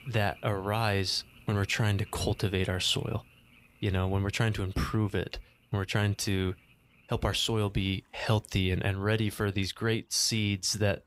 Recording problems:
animal sounds; faint; throughout; 25 dB below the speech

